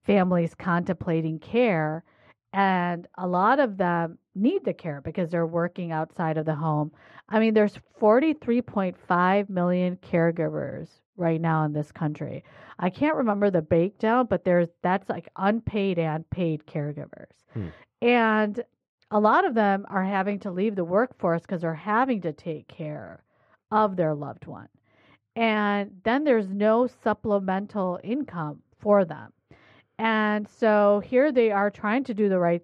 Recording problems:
muffled; very; fading above 2 kHz

